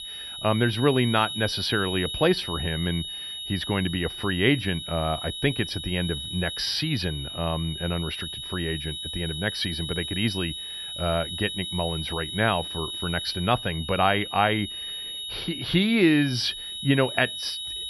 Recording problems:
high-pitched whine; loud; throughout; 4 kHz, 6 dB below the speech

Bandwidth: 14 kHz